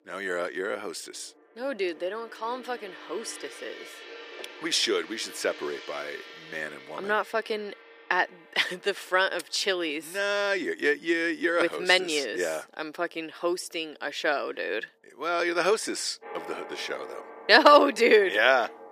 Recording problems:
thin; somewhat; fading below 350 Hz
background music; noticeable; throughout; 20 dB below the speech

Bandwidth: 15 kHz